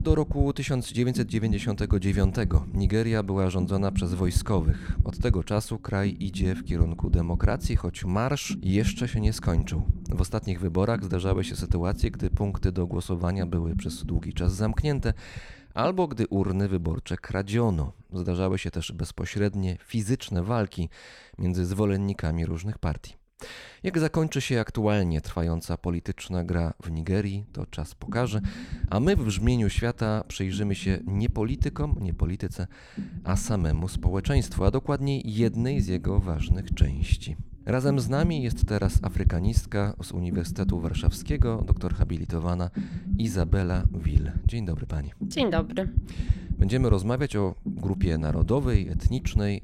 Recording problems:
low rumble; noticeable; until 16 s and from 27 s on; 10 dB below the speech

